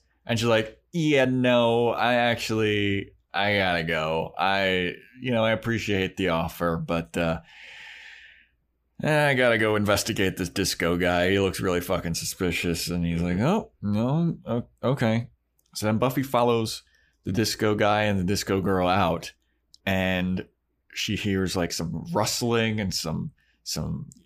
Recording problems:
uneven, jittery; strongly; from 1 to 23 s

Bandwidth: 15 kHz